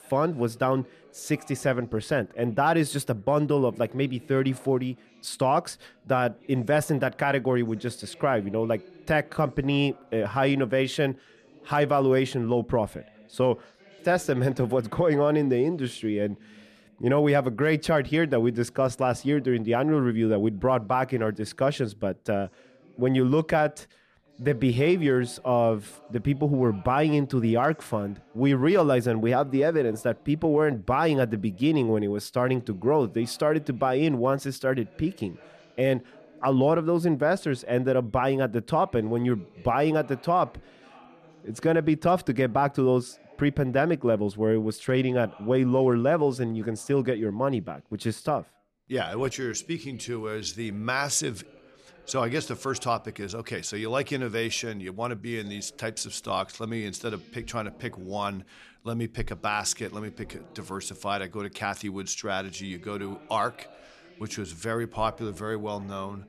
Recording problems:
background chatter; faint; throughout; 2 voices, 25 dB below the speech

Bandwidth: 13.5 kHz